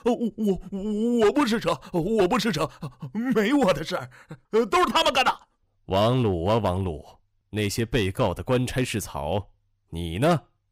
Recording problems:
distortion; slight; 4% of the sound clipped

